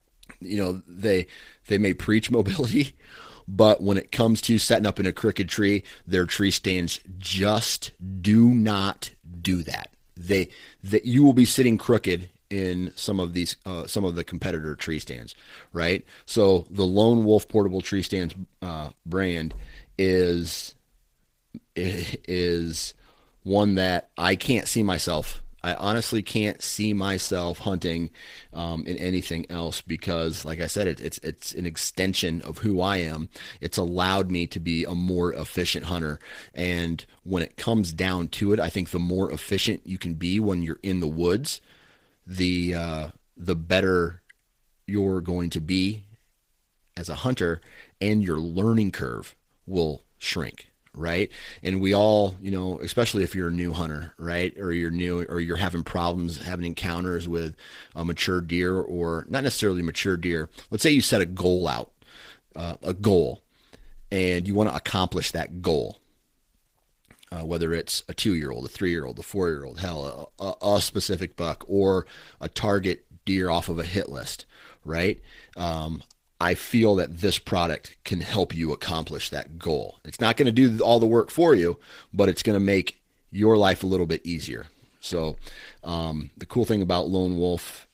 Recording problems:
garbled, watery; slightly; nothing above 15.5 kHz

